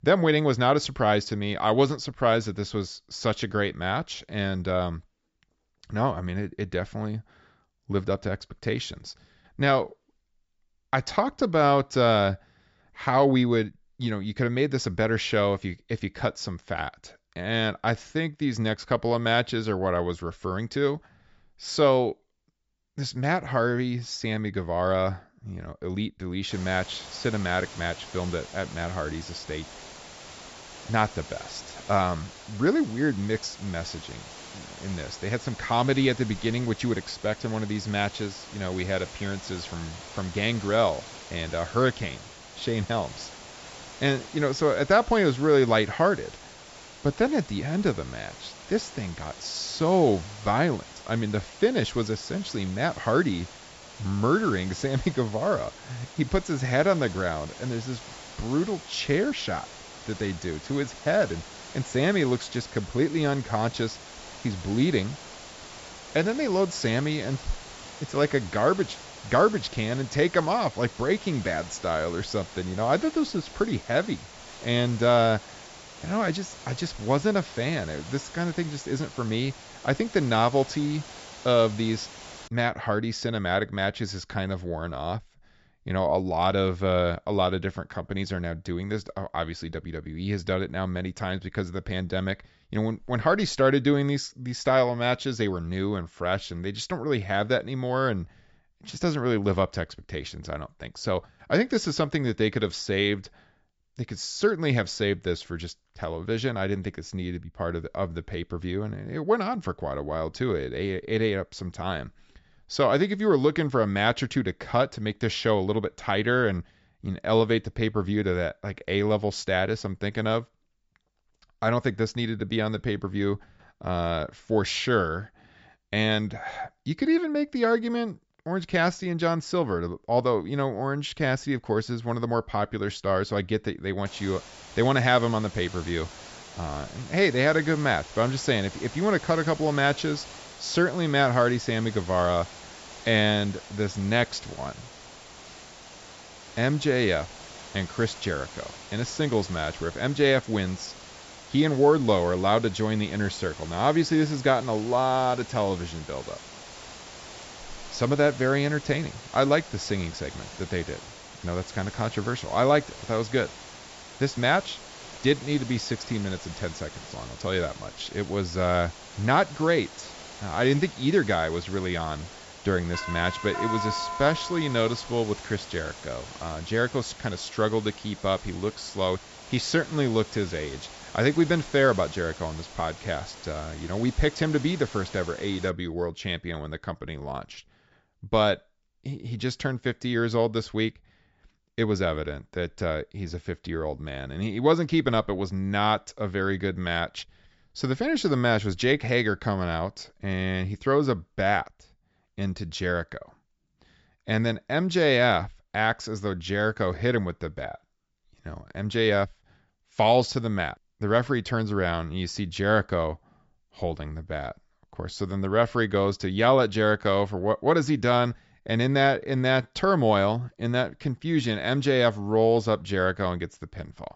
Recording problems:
high frequencies cut off; noticeable; nothing above 8 kHz
hiss; noticeable; from 27 s to 1:22 and from 2:14 to 3:06; 15 dB below the speech
doorbell; noticeable; from 2:53 to 2:55; peak 3 dB below the speech

